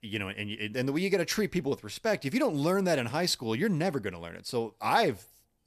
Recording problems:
none

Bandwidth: 14.5 kHz